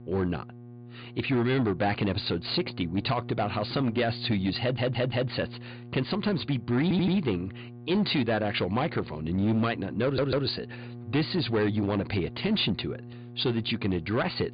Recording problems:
high frequencies cut off; severe; nothing above 5 kHz
distortion; slight; 9% of the sound clipped
electrical hum; faint; throughout; 60 Hz, 20 dB below the speech
audio stuttering; at 4.5 s, at 7 s and at 10 s

